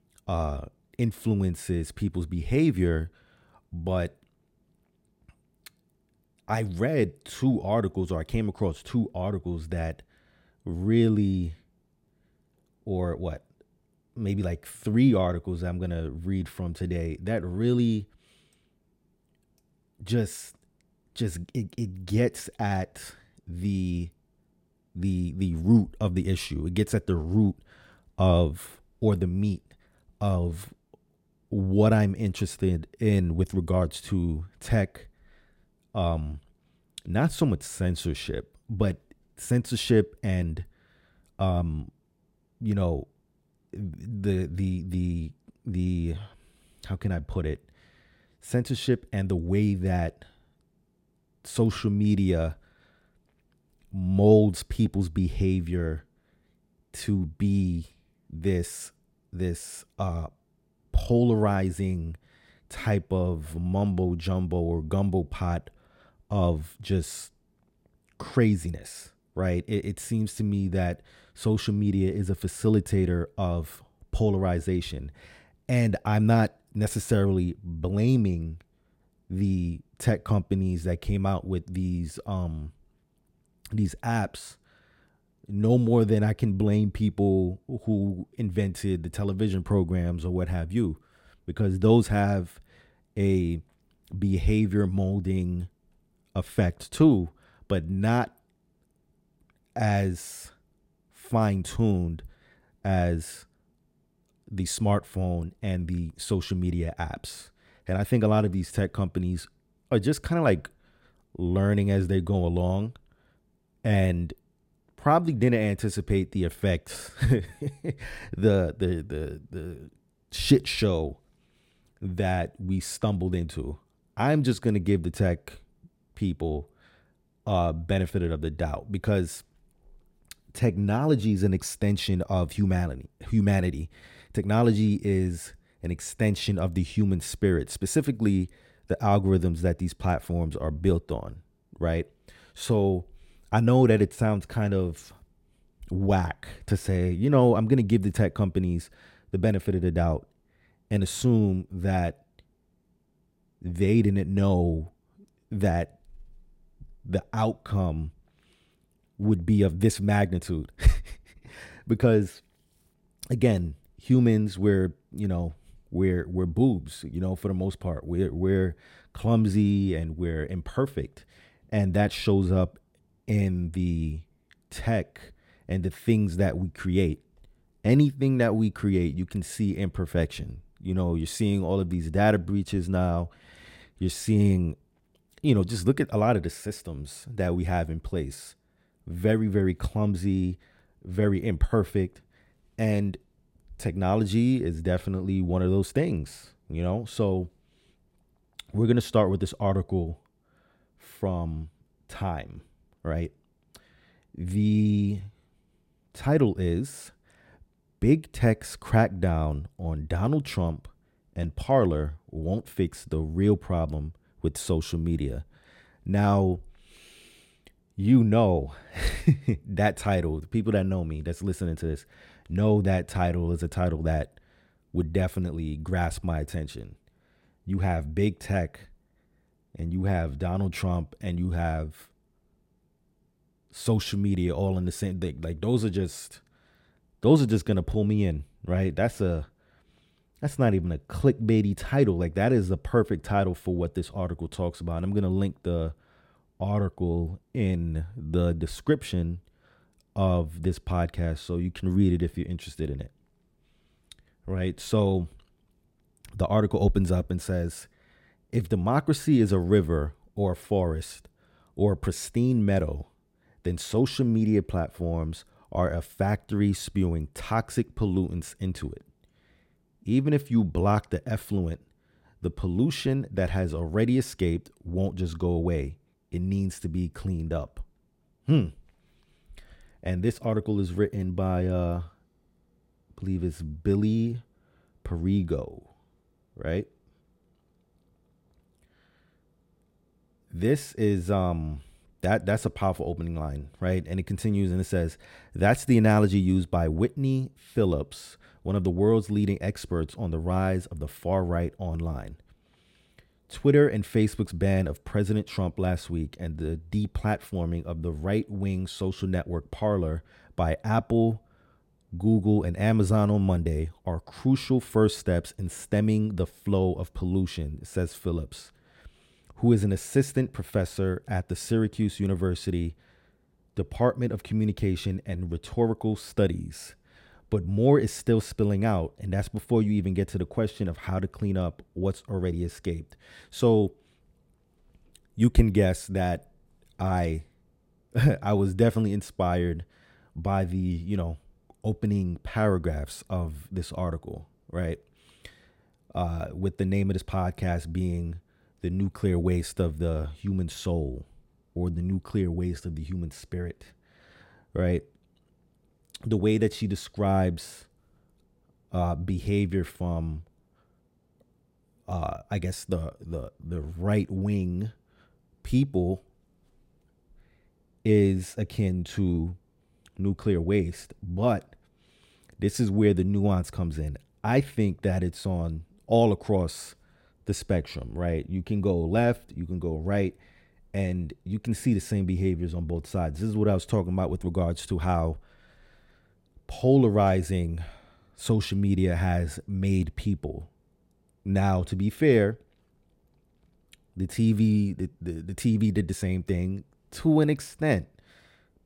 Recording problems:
none

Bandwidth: 16.5 kHz